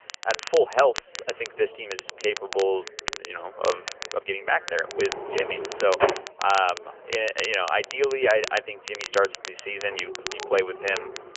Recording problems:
phone-call audio; nothing above 3 kHz
crackle, like an old record; noticeable; 10 dB below the speech
background chatter; faint; throughout; 3 voices, 25 dB below the speech
uneven, jittery; strongly; from 1 to 11 s
door banging; loud; from 5 to 6 s; peak 2 dB above the speech
dog barking; faint; from 10 s on; peak 10 dB below the speech

